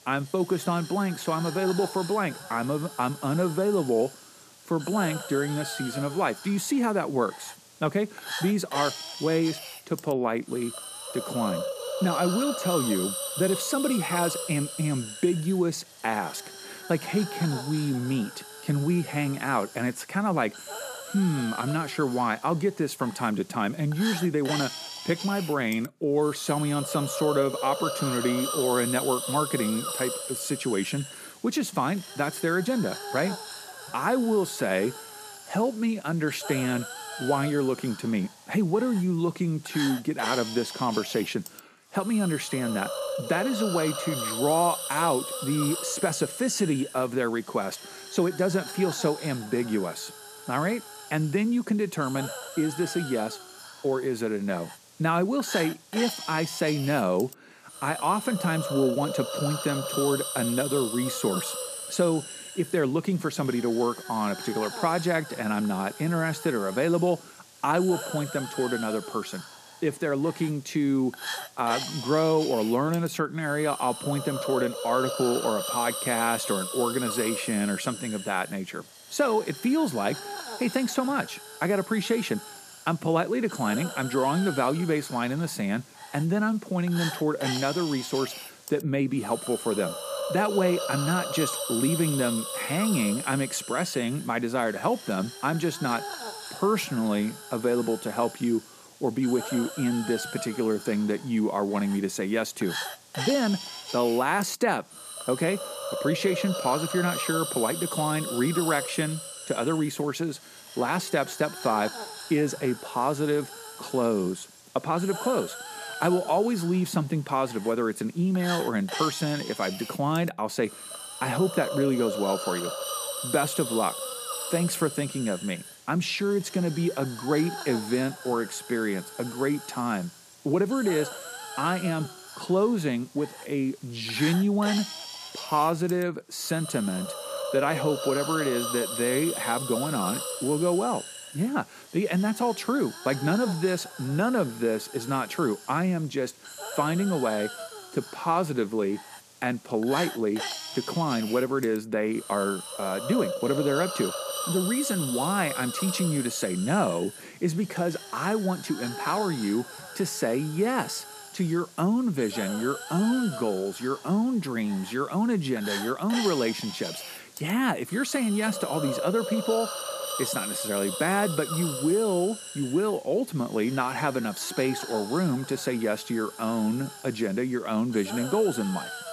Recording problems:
hiss; loud; throughout; 7 dB below the speech

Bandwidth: 14.5 kHz